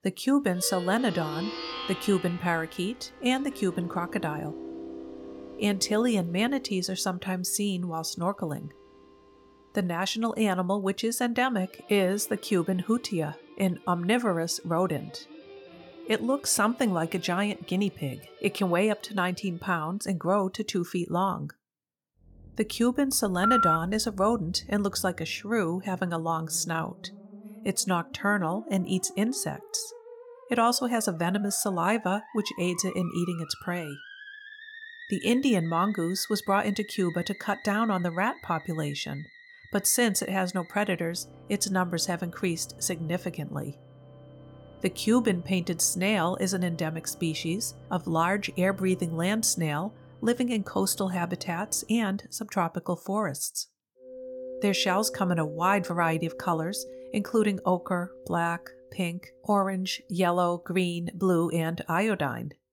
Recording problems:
background music; noticeable; throughout; 15 dB below the speech
phone ringing; loud; at 23 s; peak 5 dB above the speech

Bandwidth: 18 kHz